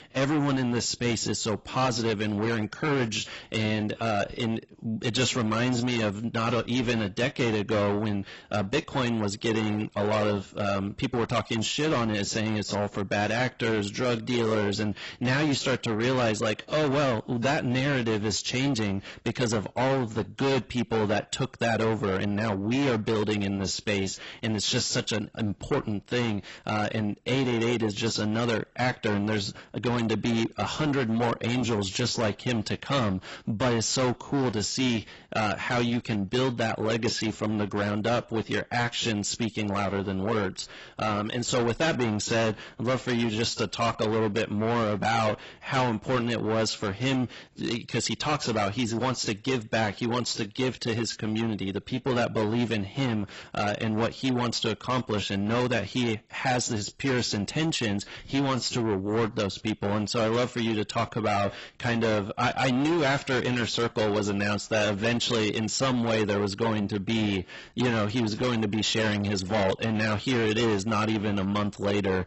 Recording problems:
distortion; heavy; 6 dB below the speech
garbled, watery; badly; nothing above 8 kHz

